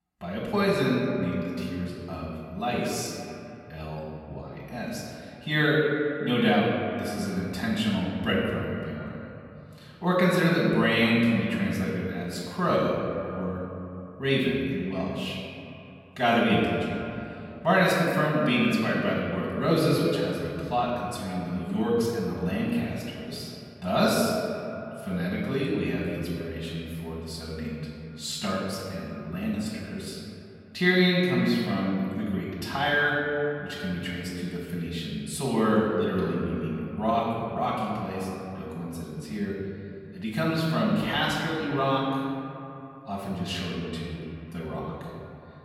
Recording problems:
off-mic speech; far
echo of what is said; noticeable; throughout; 130 ms later, 20 dB below the speech
room echo; noticeable; dies away in 2.2 s

